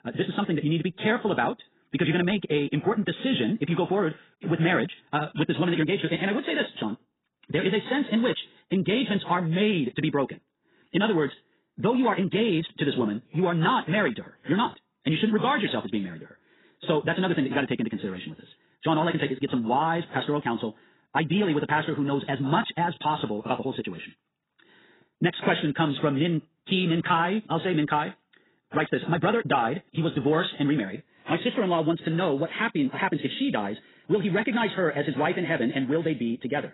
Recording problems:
garbled, watery; badly; nothing above 4 kHz
wrong speed, natural pitch; too fast; 1.8 times normal speed

